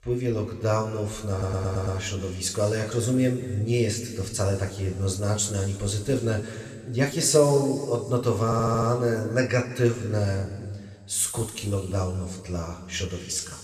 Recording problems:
room echo; noticeable; dies away in 2.1 s
off-mic speech; somewhat distant
audio stuttering; at 1.5 s and at 8.5 s

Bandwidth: 14 kHz